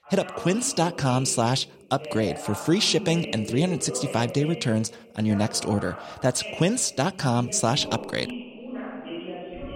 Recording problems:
voice in the background; noticeable; throughout; 10 dB below the speech

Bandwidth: 16 kHz